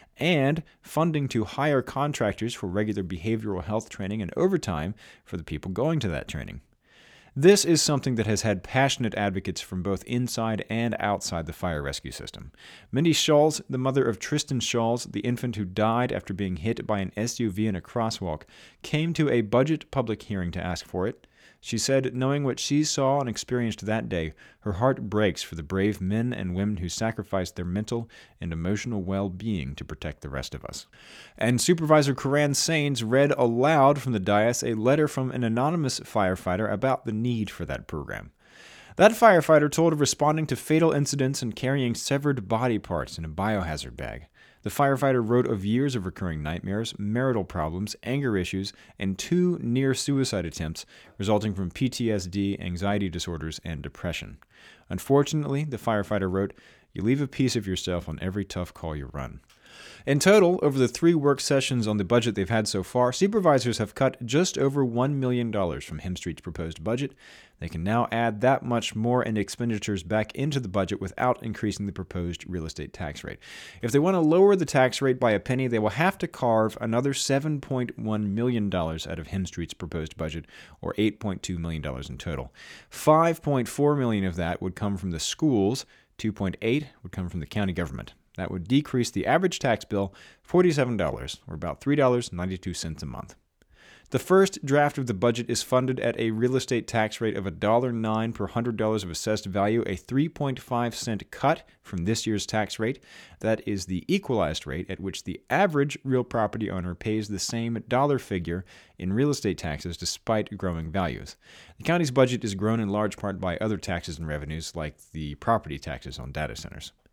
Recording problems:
none

